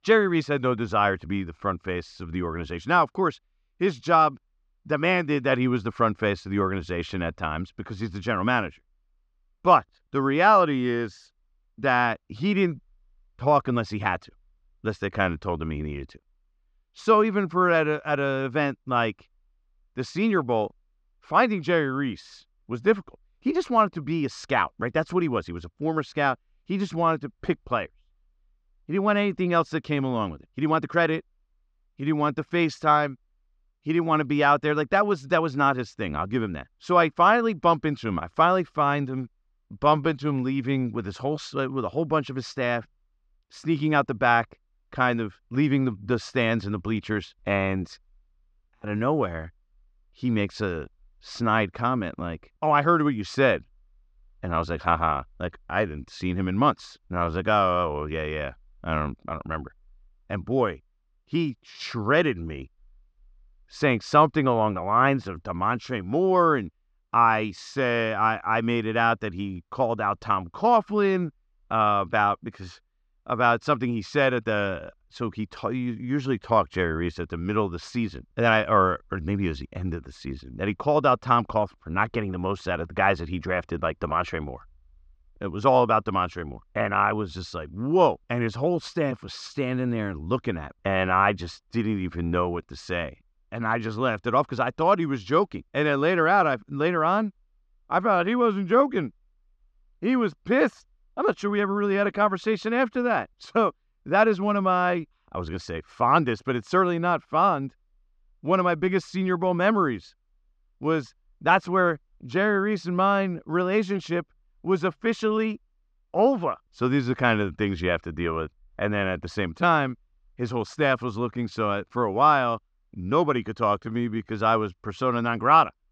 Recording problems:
muffled; very slightly; fading above 5 kHz
uneven, jittery; slightly; from 30 s to 2:04

